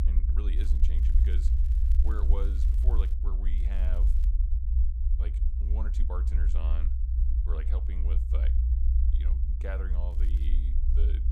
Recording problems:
low rumble; loud; throughout; 2 dB below the speech
crackling; noticeable; from 0.5 to 3 s, at 3.5 s and at 10 s; 15 dB below the speech

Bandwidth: 15 kHz